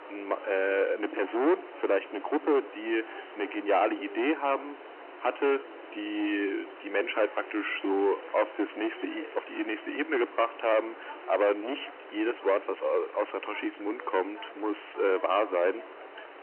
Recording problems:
distortion; heavy; 8 dB below the speech
phone-call audio
chatter from many people; noticeable; throughout; 20 dB below the speech
hiss; noticeable; throughout; 20 dB below the speech
crackling; faint; from 7 to 9.5 s; 25 dB below the speech

